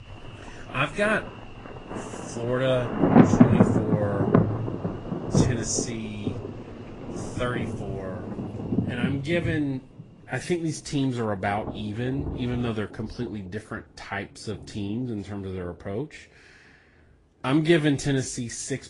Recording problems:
garbled, watery; slightly; nothing above 10 kHz
rain or running water; very loud; throughout; 3 dB above the speech

